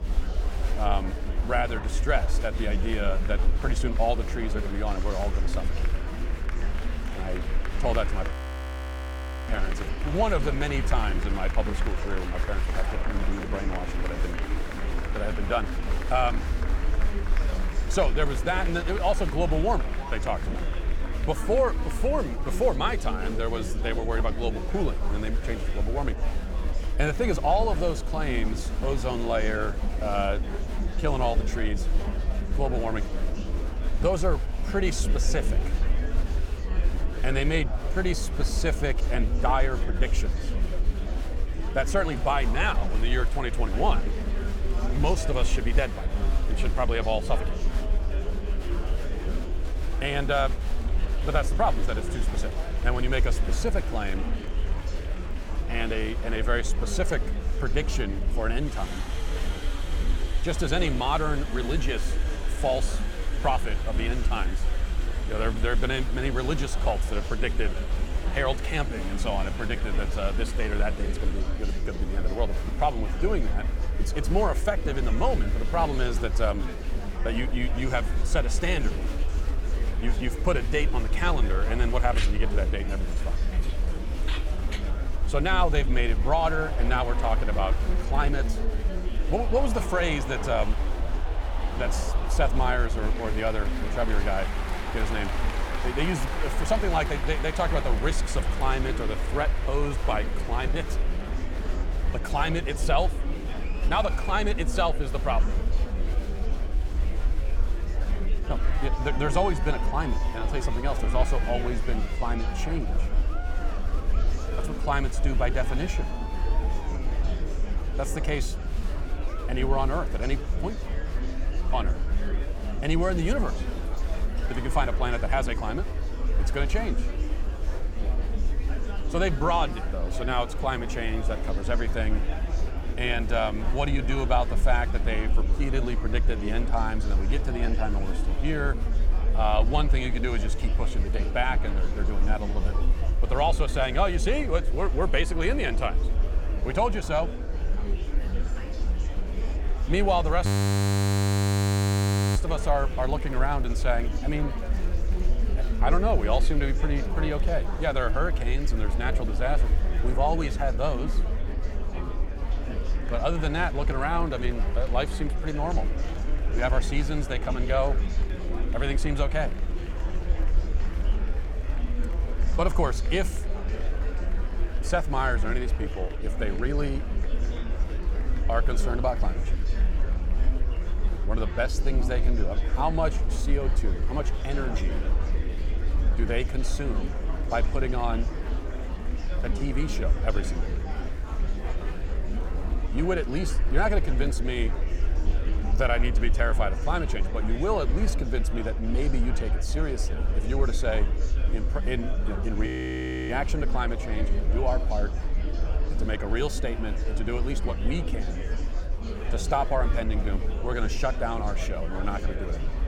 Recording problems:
murmuring crowd; loud; throughout; 8 dB below the speech
low rumble; noticeable; throughout; 20 dB below the speech
audio freezing; at 8.5 s for 1 s, at 2:30 for 2 s and at 3:23 for 0.5 s

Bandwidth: 17.5 kHz